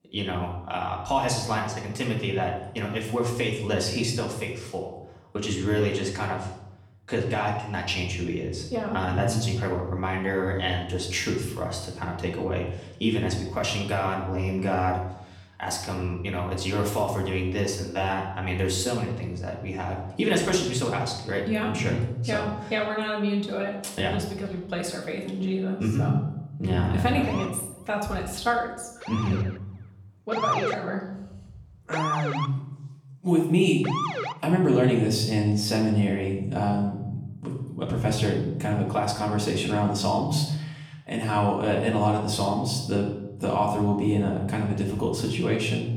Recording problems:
off-mic speech; far
room echo; noticeable; dies away in 0.8 s
siren; loud; from 27 to 34 s; peak 1 dB above the speech

